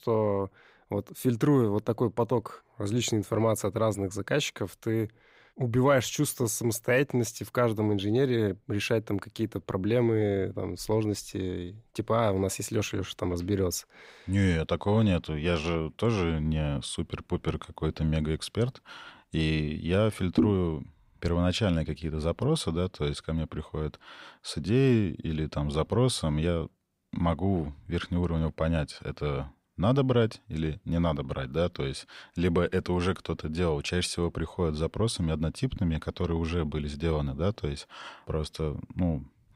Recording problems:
none

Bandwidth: 15.5 kHz